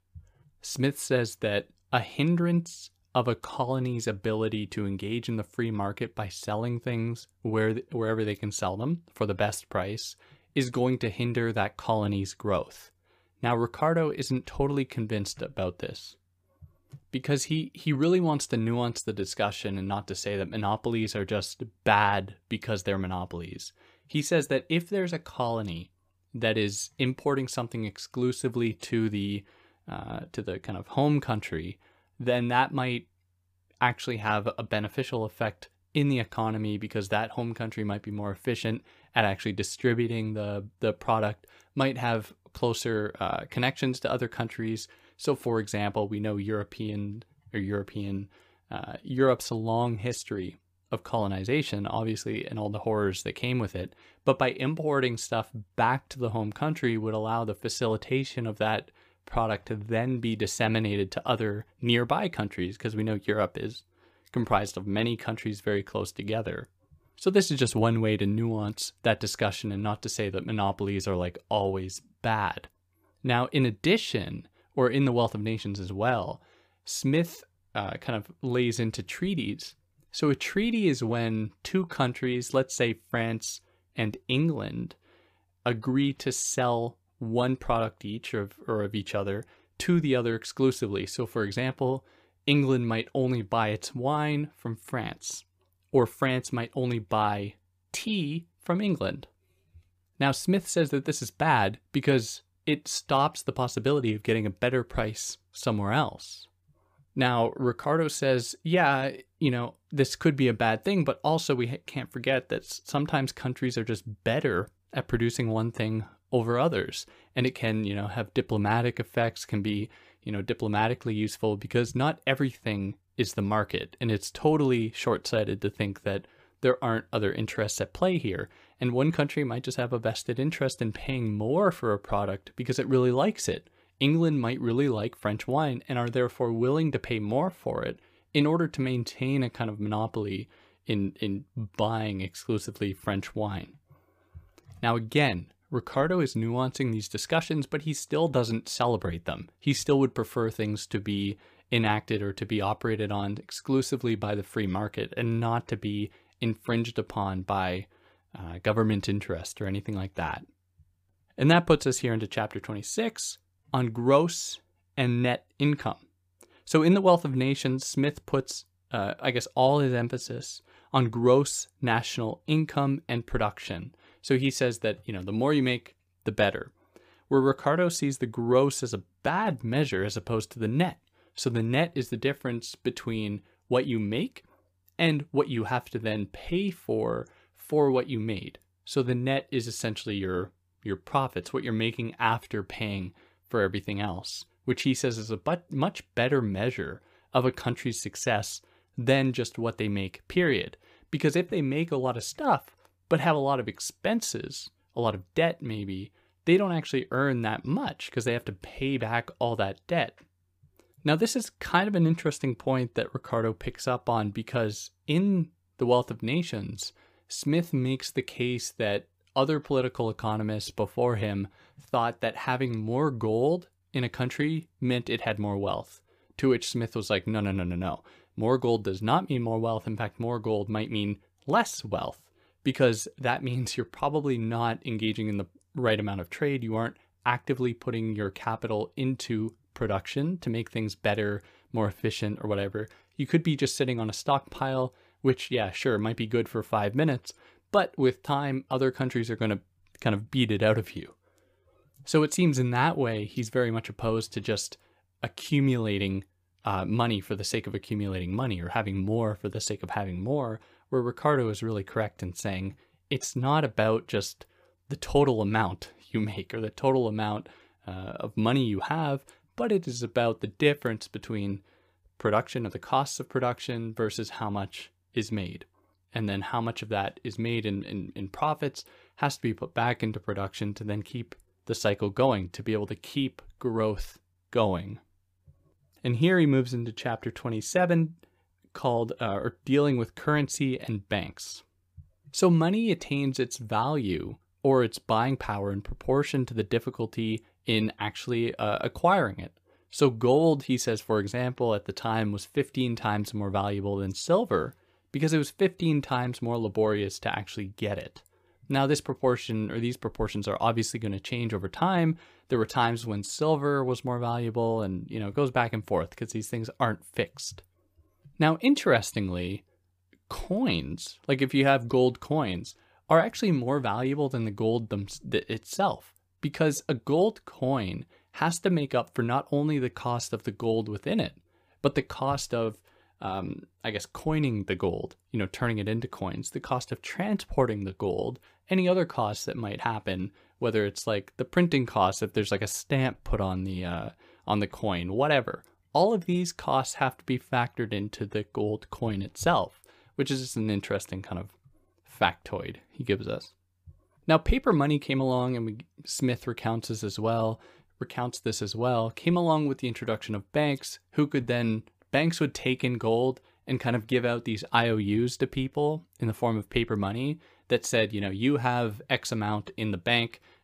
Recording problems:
none

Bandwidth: 15 kHz